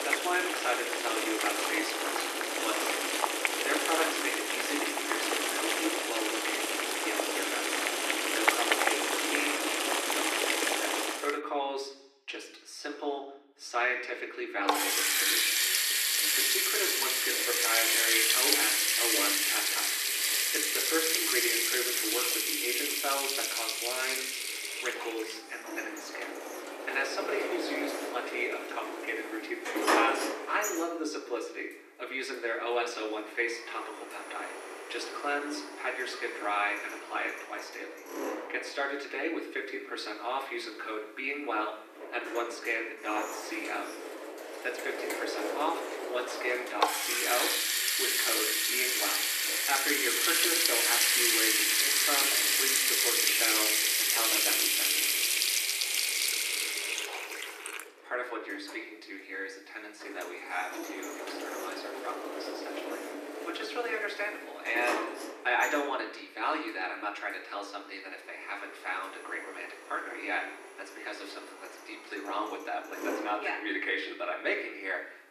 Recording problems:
thin; very; fading below 300 Hz
room echo; slight; dies away in 0.8 s
off-mic speech; somewhat distant
household noises; very loud; throughout; 7 dB above the speech

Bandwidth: 14.5 kHz